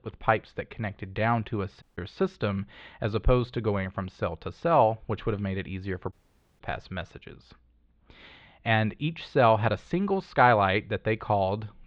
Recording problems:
muffled; very; fading above 3.5 kHz
audio cutting out; at 2 s and at 6 s

